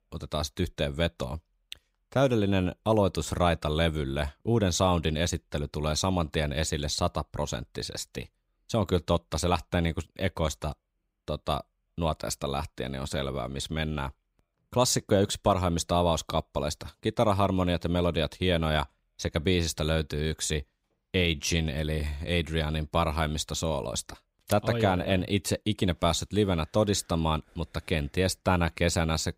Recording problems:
none

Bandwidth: 15.5 kHz